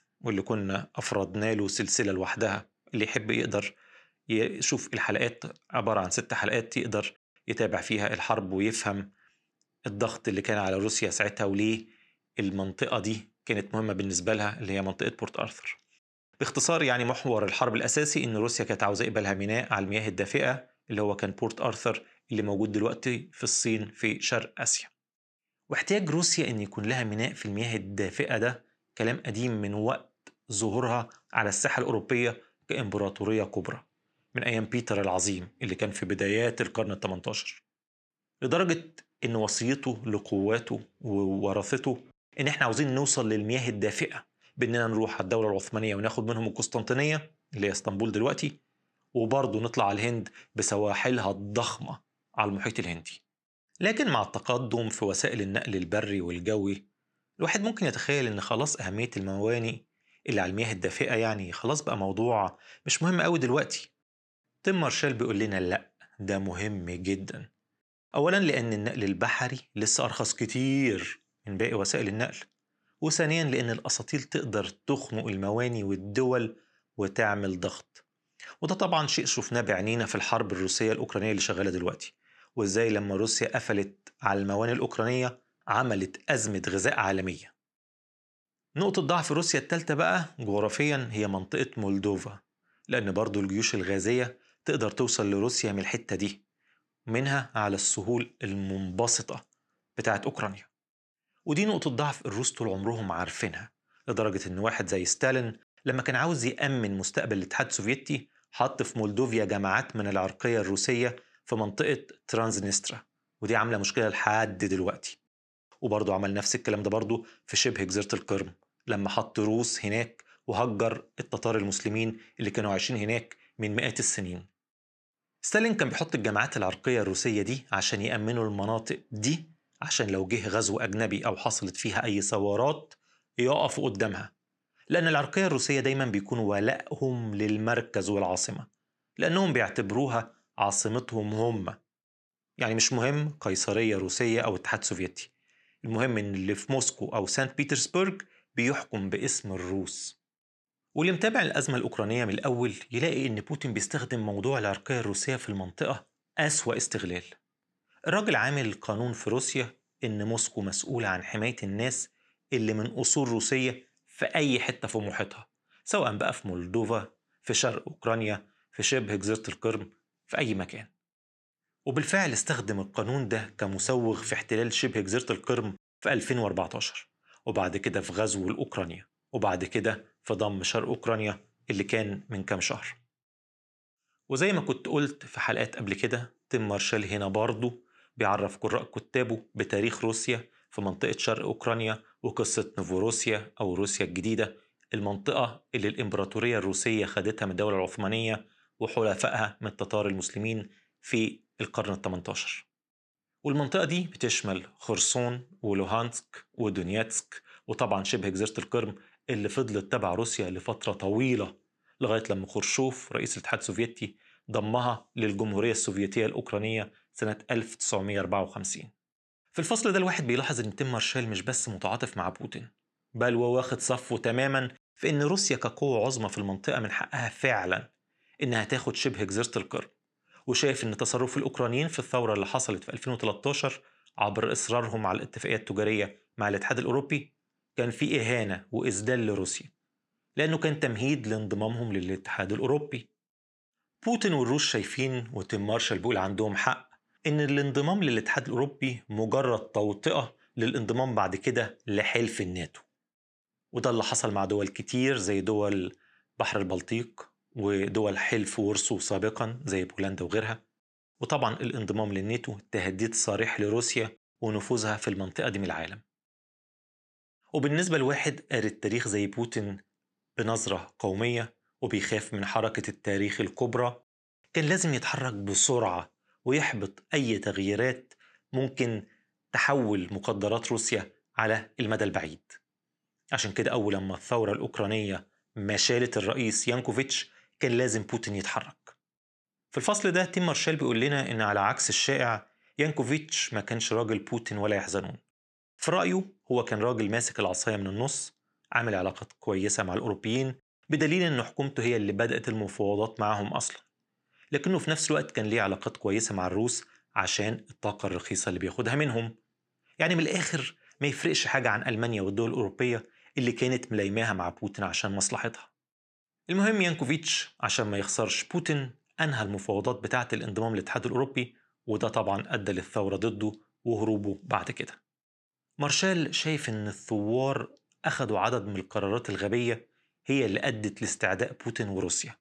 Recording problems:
none

